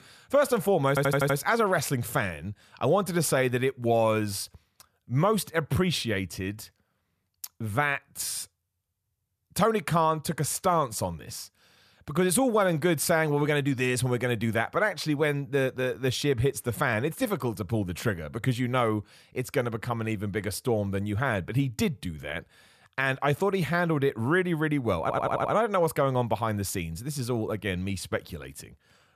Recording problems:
audio stuttering; at 1 s and at 25 s

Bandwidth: 14.5 kHz